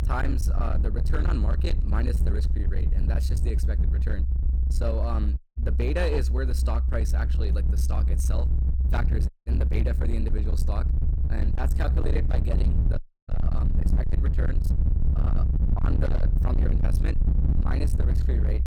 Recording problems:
distortion; heavy; 37% of the sound clipped
low rumble; loud; throughout; 5 dB below the speech
audio cutting out; at 5.5 s, at 9.5 s and at 13 s

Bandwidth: 19 kHz